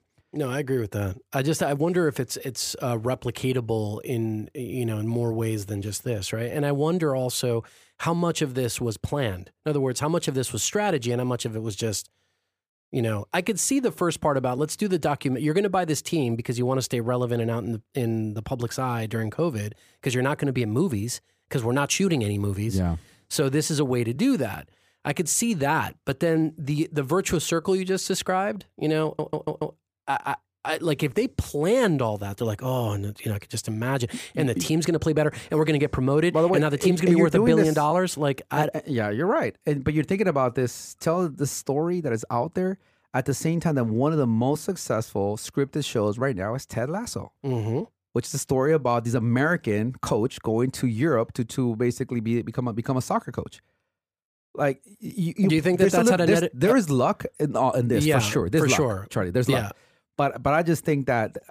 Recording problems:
audio stuttering; at 29 s

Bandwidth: 15 kHz